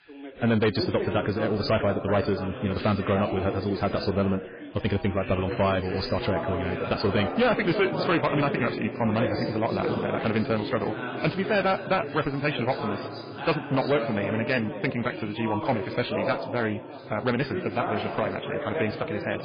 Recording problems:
garbled, watery; badly
wrong speed, natural pitch; too fast; 1.5 times normal speed
distortion; slight; 4% of the sound clipped
background chatter; loud; throughout; 3 voices, 6 dB below the speech

